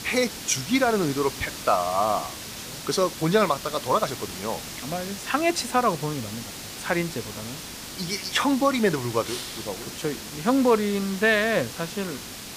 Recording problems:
hiss; loud; throughout; 10 dB below the speech

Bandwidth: 15 kHz